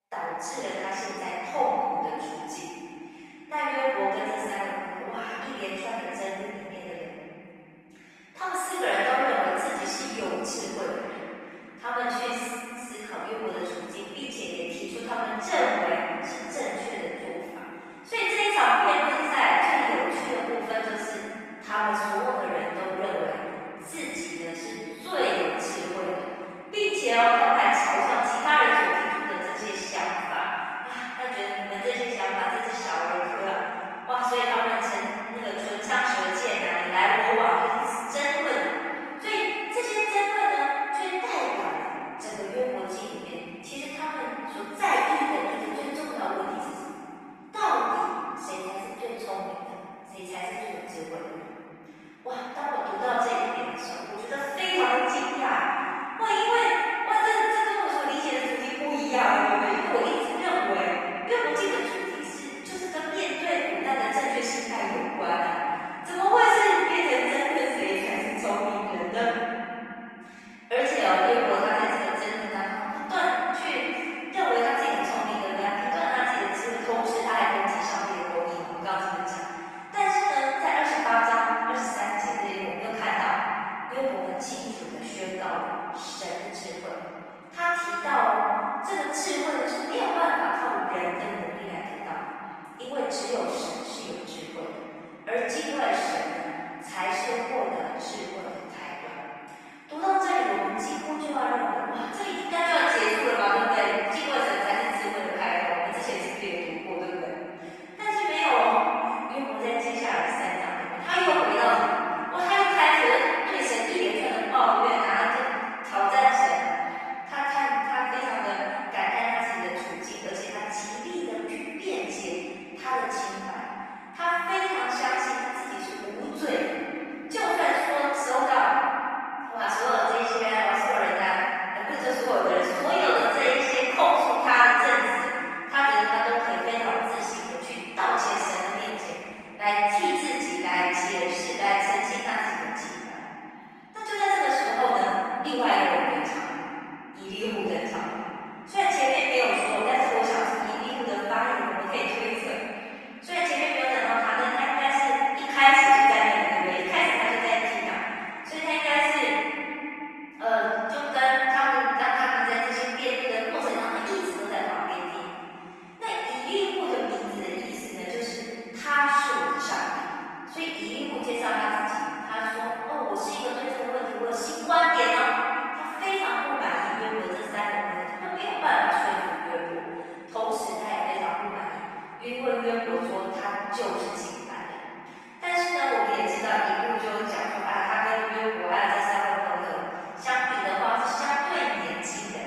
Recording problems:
room echo; strong; dies away in 3 s
off-mic speech; far
thin; somewhat; fading below 500 Hz
garbled, watery; slightly

